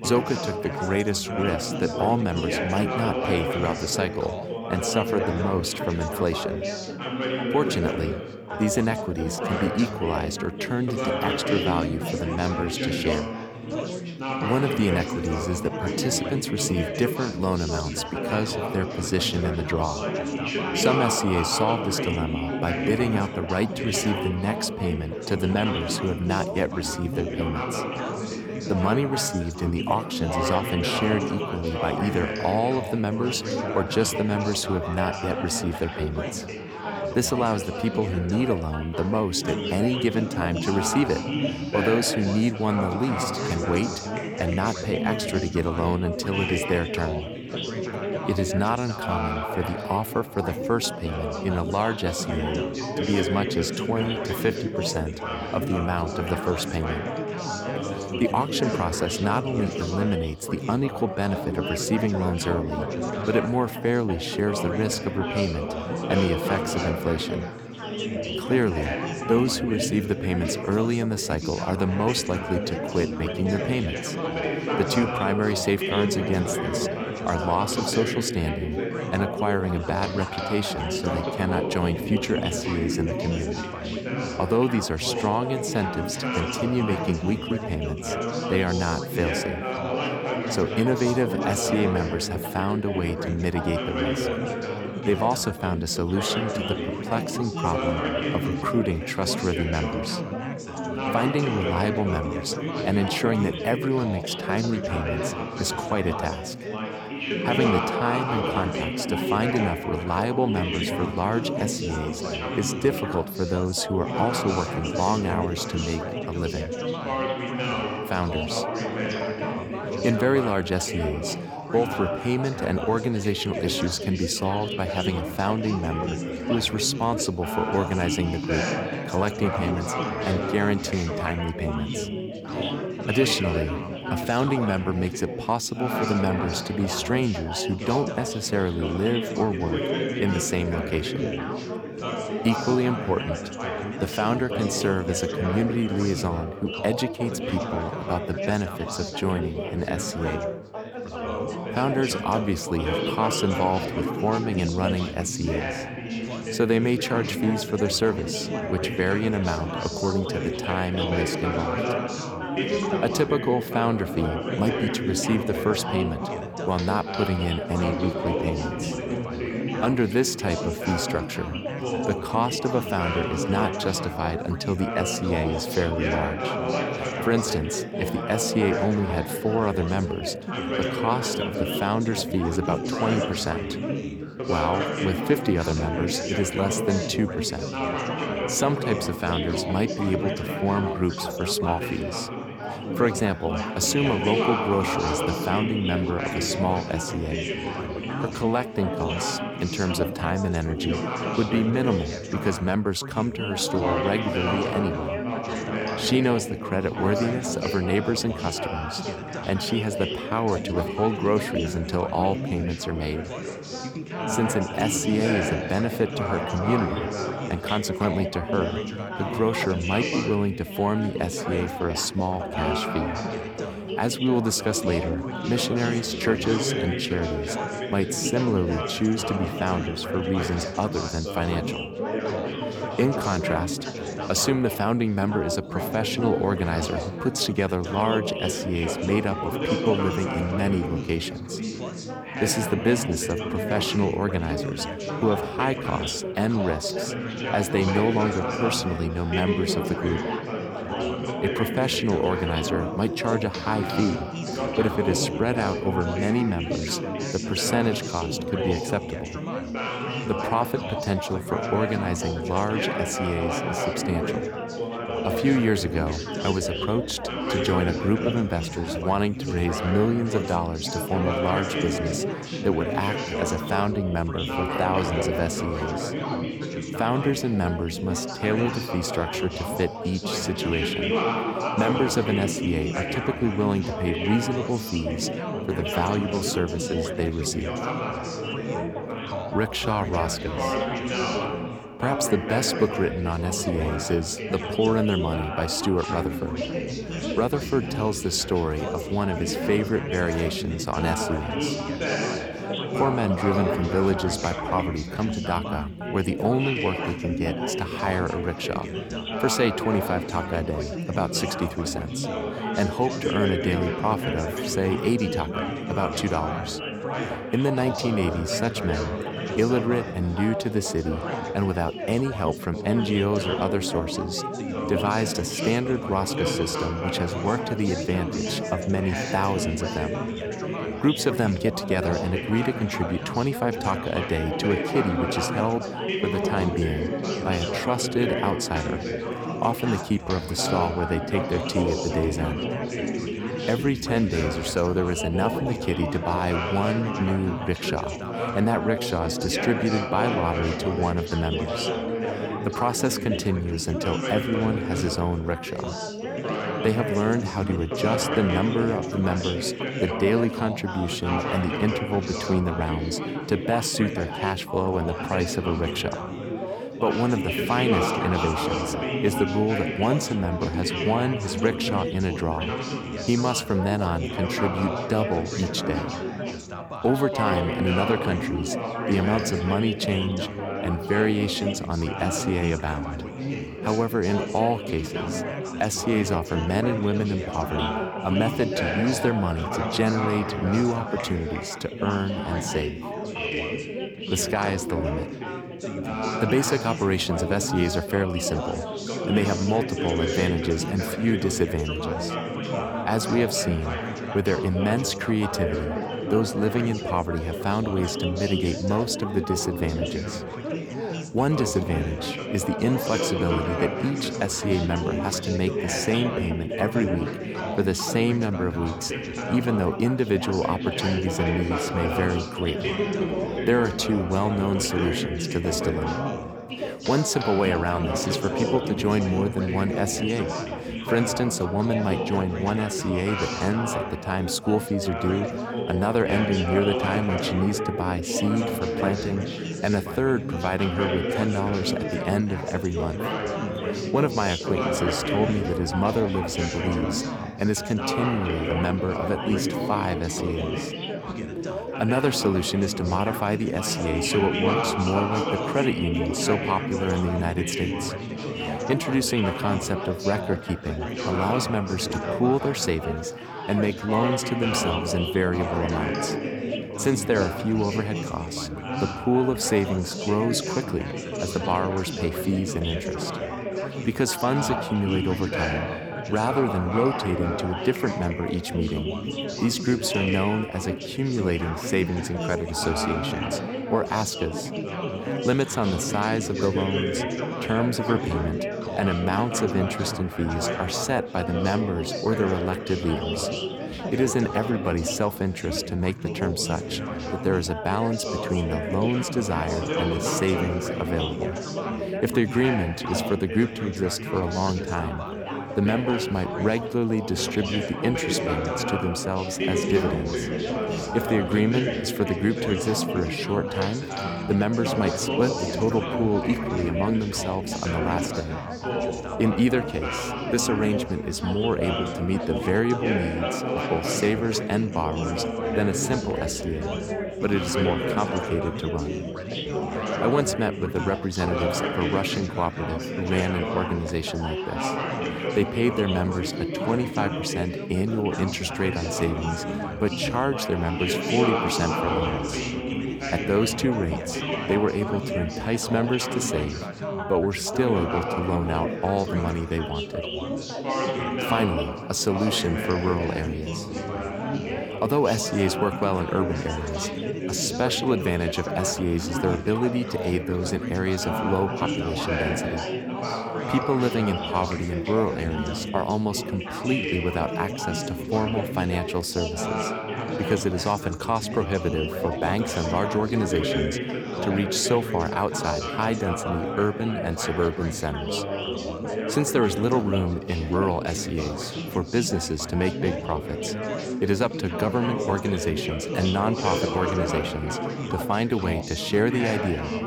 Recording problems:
chatter from many people; loud; throughout; 3 dB below the speech

